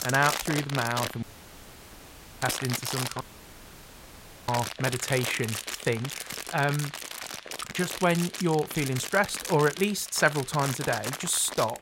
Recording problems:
household noises; loud; throughout; 6 dB below the speech
hiss; faint; throughout; 25 dB below the speech
audio cutting out; at 1 s for 1 s and at 3 s for 1.5 s

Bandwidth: 16 kHz